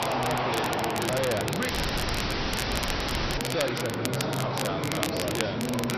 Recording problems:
distortion; heavy; 8 dB below the speech
high frequencies cut off; noticeable; nothing above 6 kHz
garbled, watery; slightly
murmuring crowd; very loud; throughout; 2 dB above the speech
crackle, like an old record; loud; 3 dB below the speech
audio cutting out; at 1.5 s for 1.5 s

